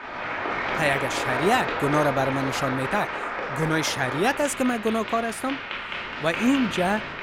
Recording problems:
crowd noise; loud; throughout; 4 dB below the speech

